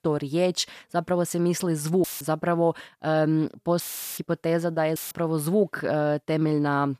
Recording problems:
audio cutting out; filled with static; at 2 s, at 4 s and at 5 s

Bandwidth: 14.5 kHz